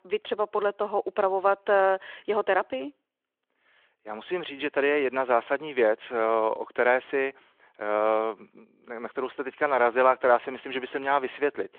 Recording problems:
phone-call audio

